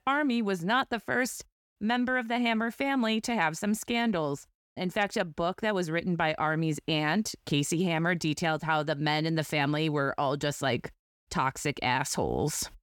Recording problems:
none

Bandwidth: 17.5 kHz